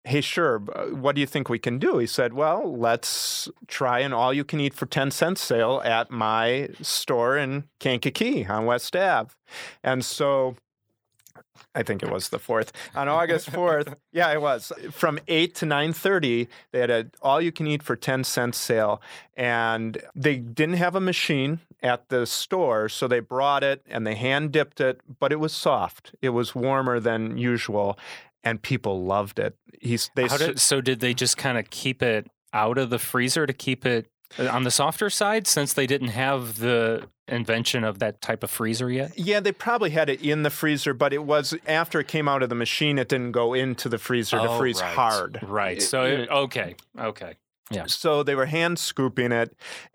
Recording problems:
none

